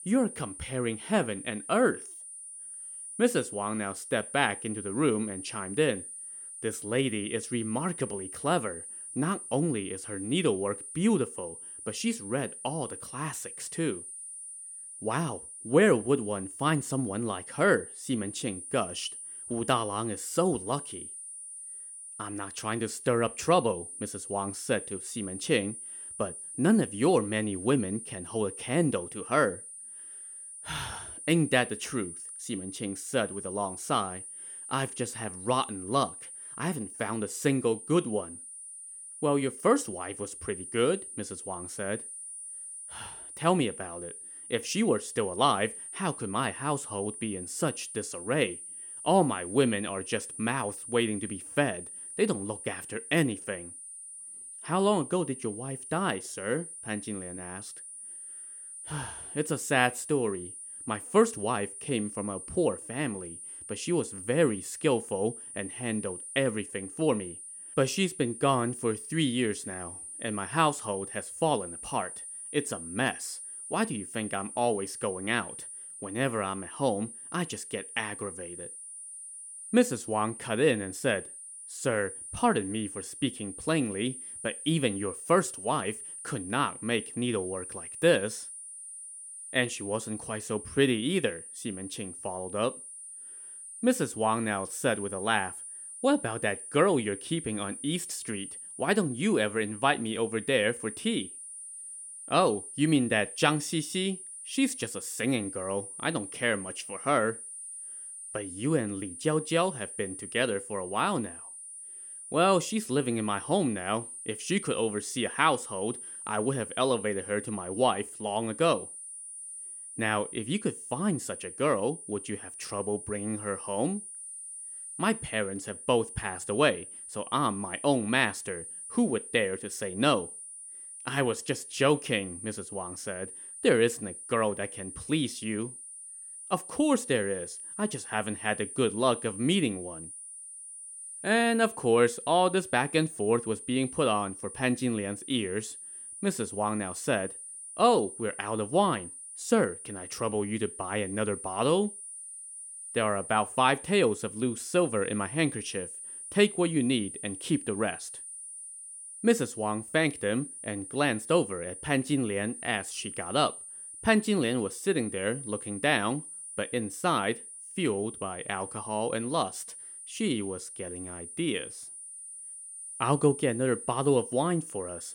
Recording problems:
high-pitched whine; noticeable; throughout; 9.5 kHz, 10 dB below the speech

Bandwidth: 17 kHz